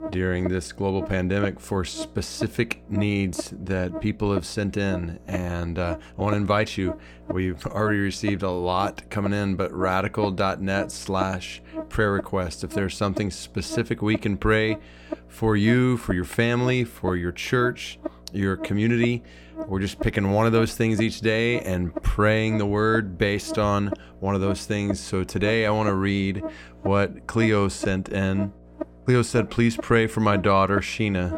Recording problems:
electrical hum; noticeable; throughout; 60 Hz, 10 dB below the speech

